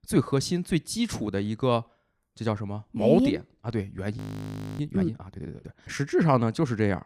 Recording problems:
audio freezing; at 4 s for 0.5 s

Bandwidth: 15.5 kHz